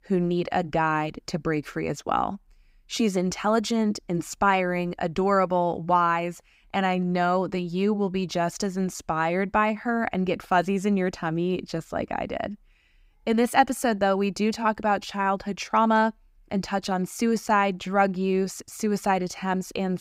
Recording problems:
none

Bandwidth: 15.5 kHz